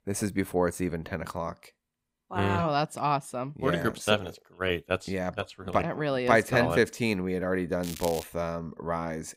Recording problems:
crackling; noticeable; at 8 s; 10 dB below the speech

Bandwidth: 15.5 kHz